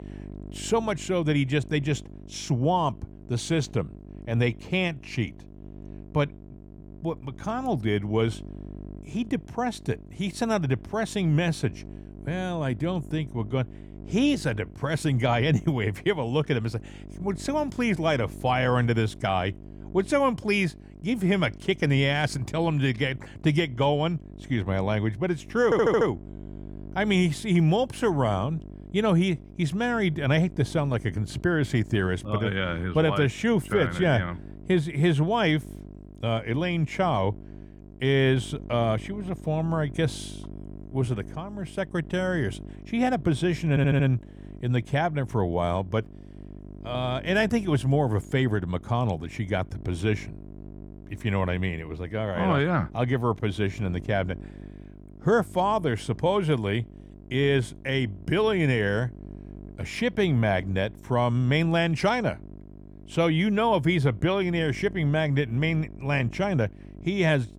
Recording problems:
electrical hum; faint; throughout; 50 Hz, 25 dB below the speech
audio stuttering; at 26 s and at 44 s

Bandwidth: 19 kHz